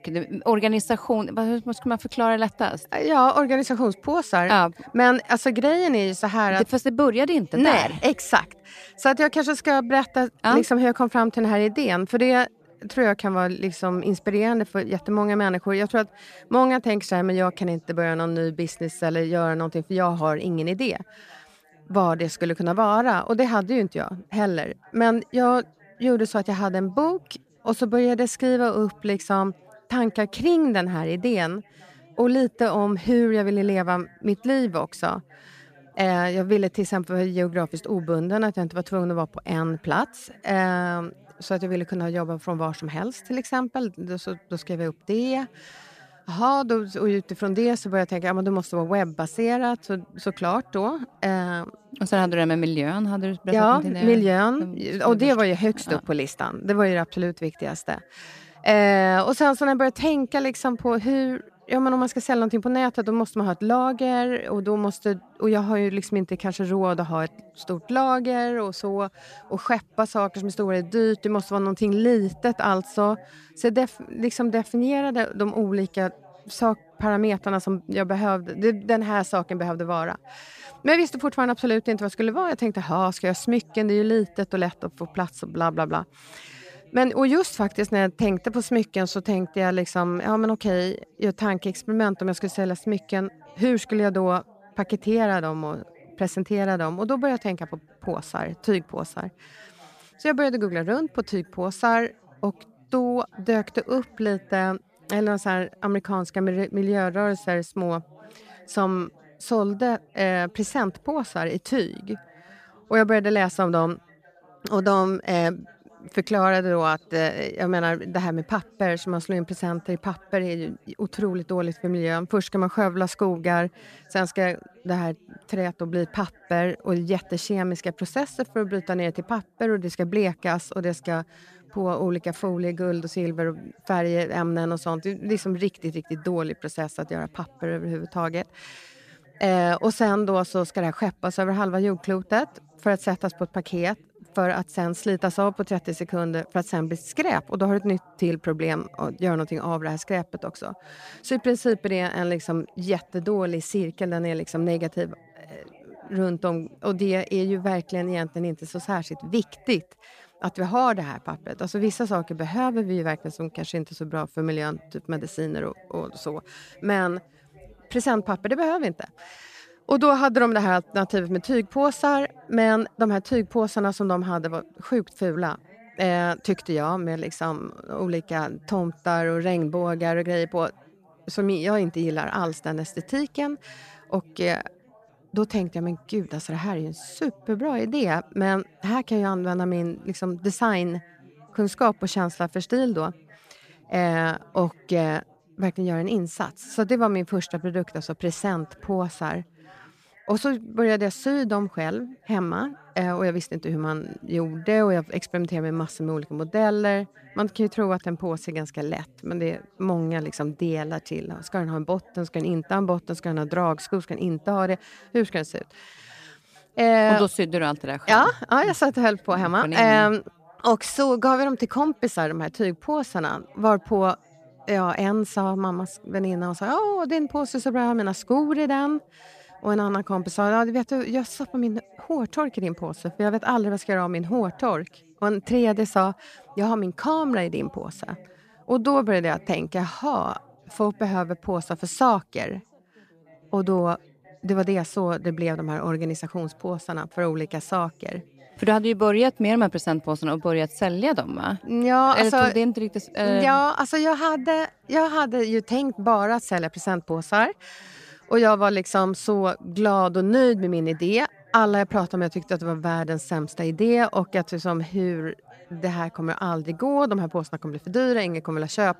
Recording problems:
background chatter; faint; throughout; 4 voices, 30 dB below the speech

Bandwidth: 14.5 kHz